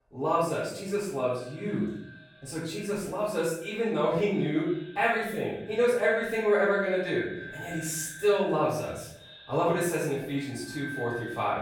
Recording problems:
off-mic speech; far
echo of what is said; noticeable; throughout; 310 ms later, 15 dB below the speech
room echo; noticeable; dies away in 0.7 s

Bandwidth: 18 kHz